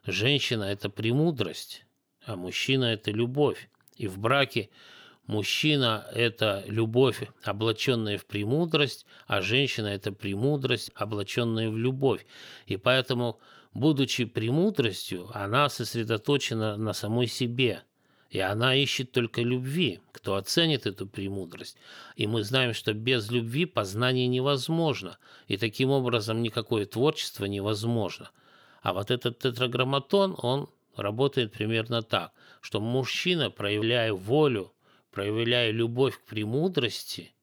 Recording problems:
none

